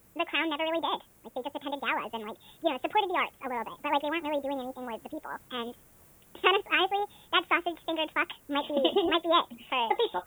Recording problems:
high frequencies cut off; severe; nothing above 4 kHz
wrong speed and pitch; too fast and too high; 1.7 times normal speed
hiss; faint; throughout; 25 dB below the speech

